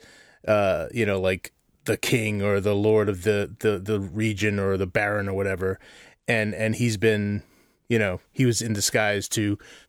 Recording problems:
none

